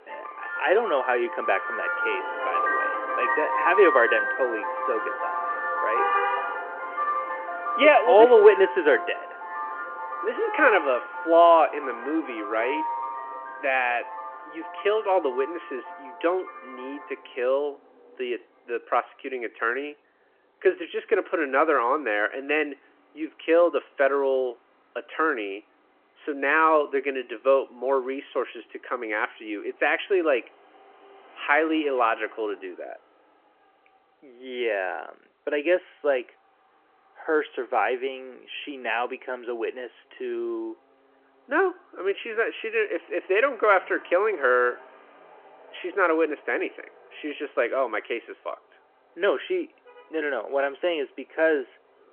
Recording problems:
phone-call audio
traffic noise; loud; throughout; 5 dB below the speech

